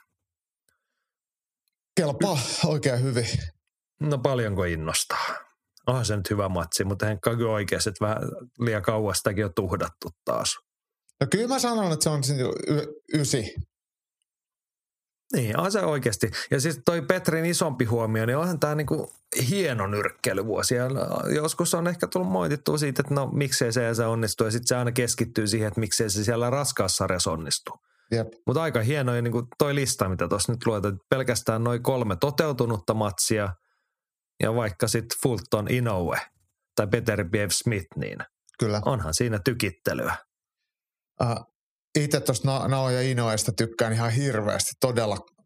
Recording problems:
squashed, flat; somewhat

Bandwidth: 15 kHz